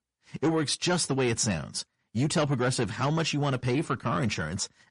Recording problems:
distortion; slight; 10 dB below the speech
garbled, watery; slightly; nothing above 10.5 kHz

